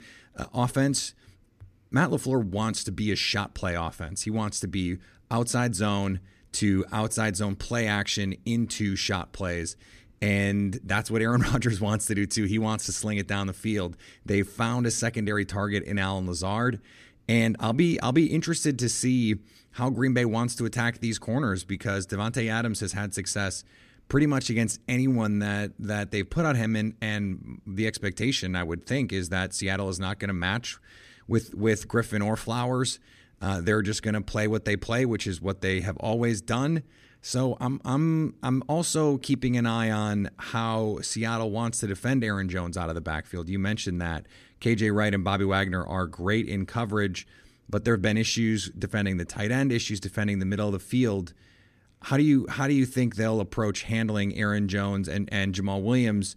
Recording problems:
none

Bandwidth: 14.5 kHz